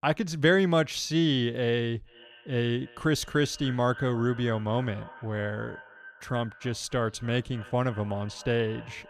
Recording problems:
echo of what is said; faint; from 2 s on; 290 ms later, 20 dB below the speech

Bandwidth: 14 kHz